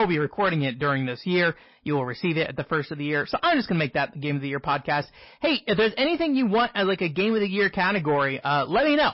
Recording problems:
distortion; slight; 10 dB below the speech
garbled, watery; slightly; nothing above 5.5 kHz
high frequencies cut off; slight
abrupt cut into speech; at the start

